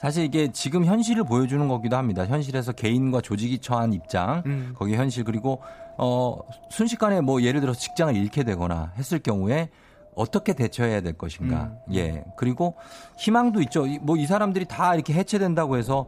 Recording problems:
wind noise on the microphone; occasional gusts; 20 dB below the speech

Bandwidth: 15 kHz